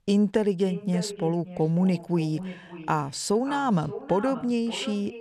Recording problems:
echo of what is said; noticeable; throughout; 570 ms later, 15 dB below the speech

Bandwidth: 13.5 kHz